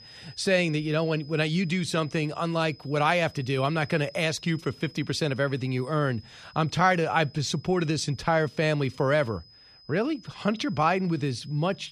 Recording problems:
high-pitched whine; faint; throughout; 5 kHz, 25 dB below the speech

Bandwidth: 14.5 kHz